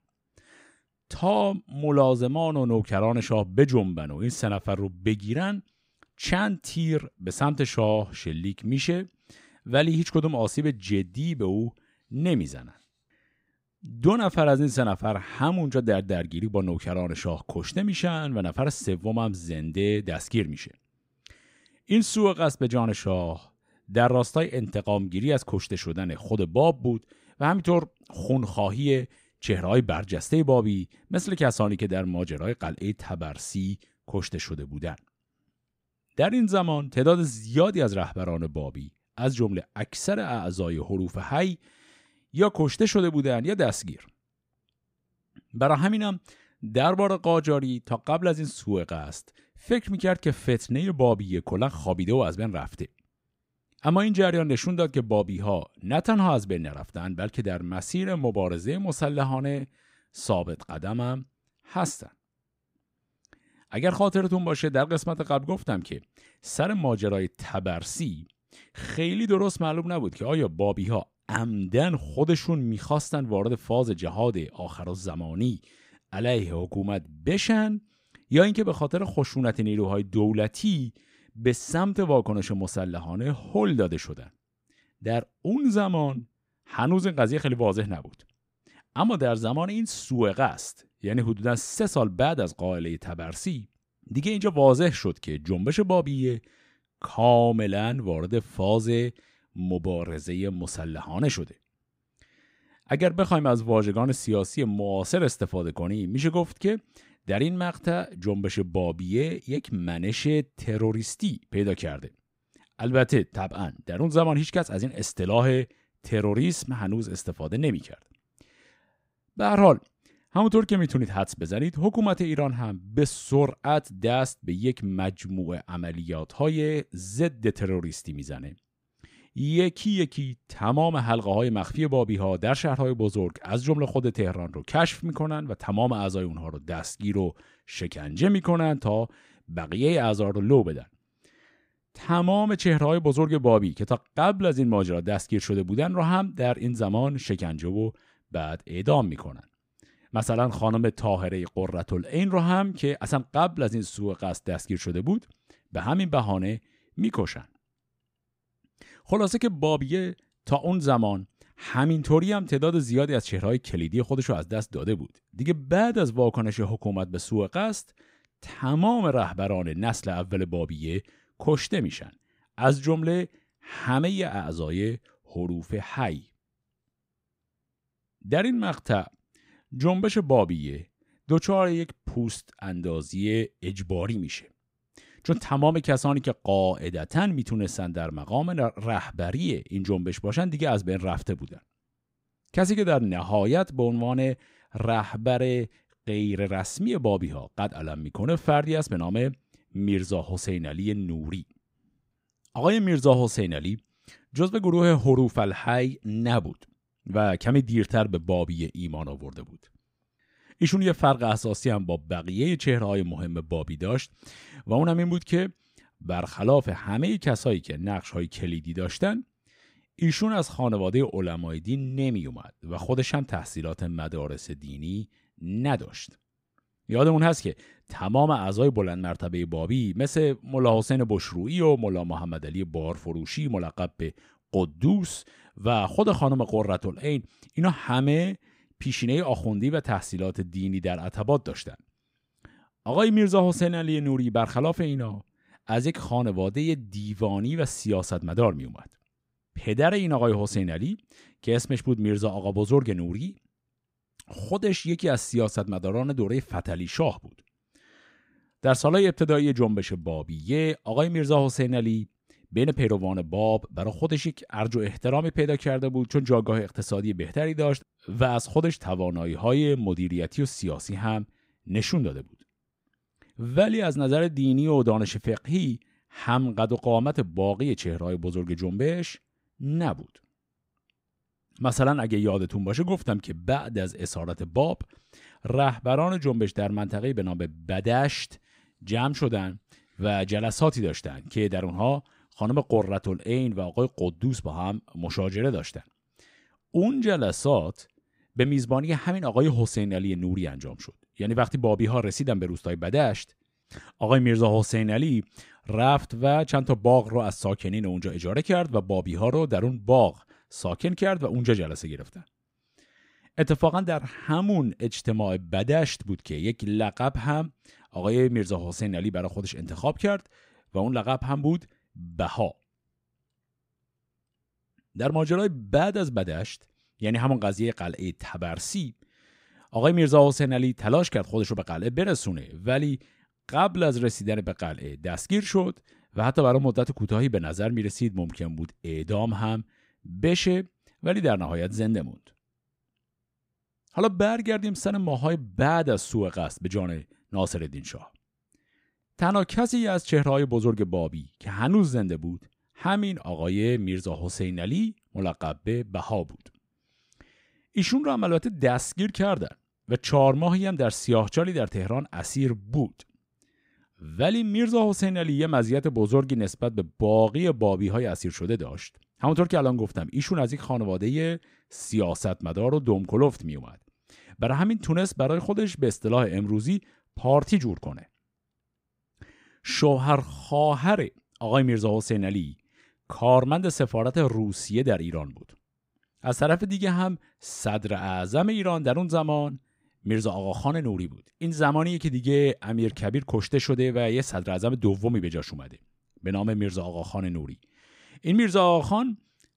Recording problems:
none

